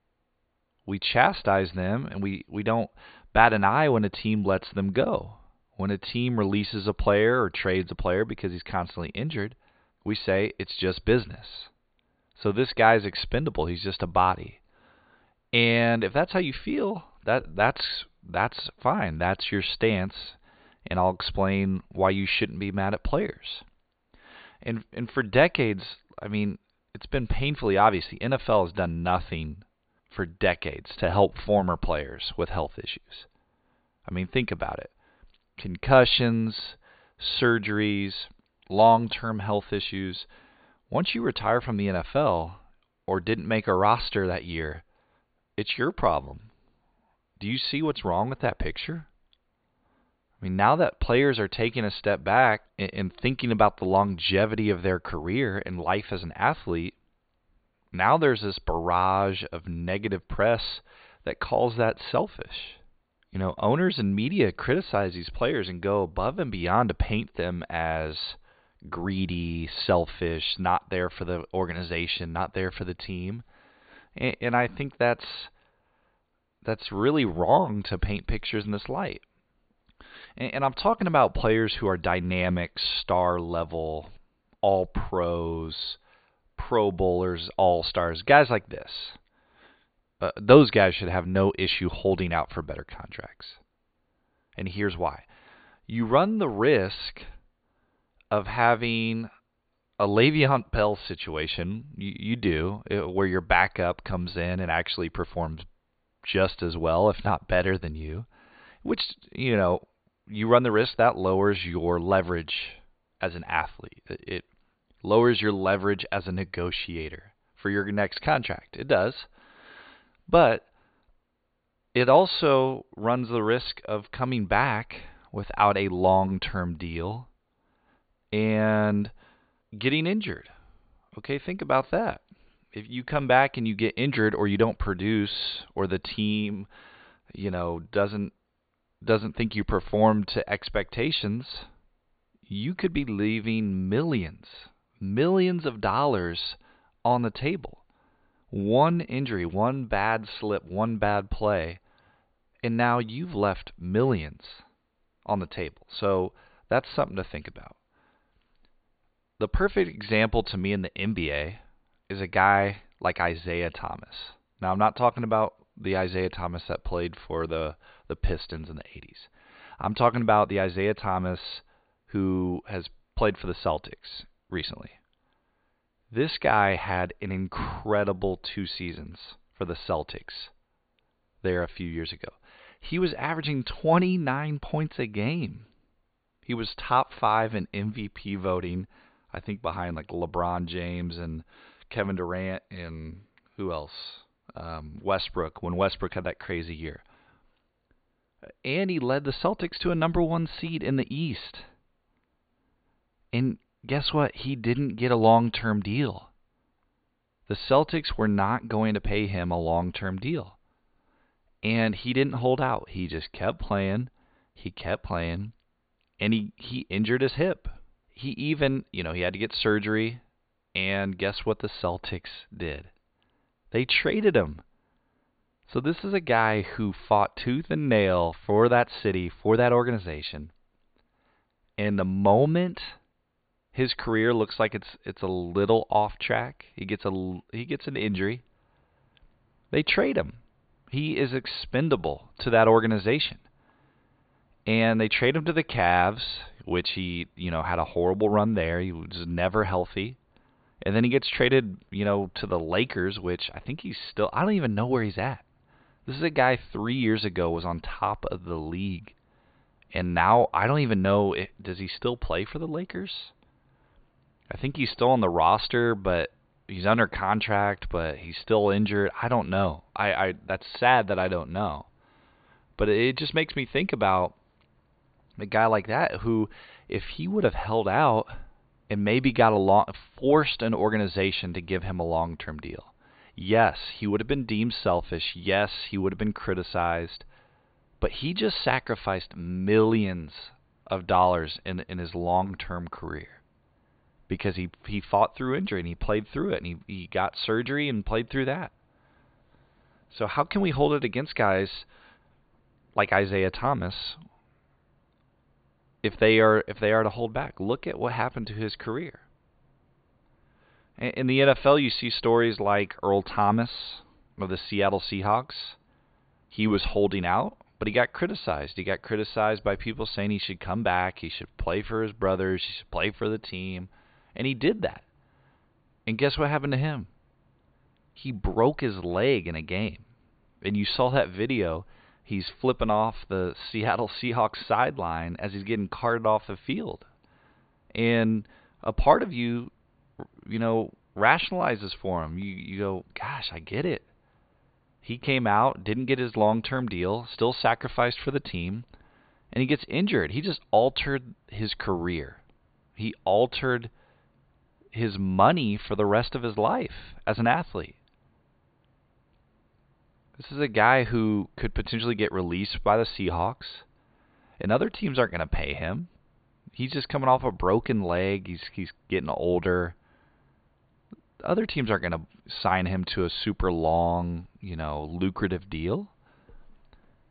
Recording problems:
high frequencies cut off; severe; nothing above 4.5 kHz

